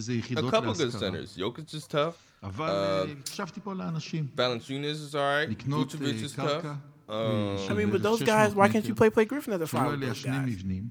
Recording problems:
voice in the background; loud; throughout; 6 dB below the speech

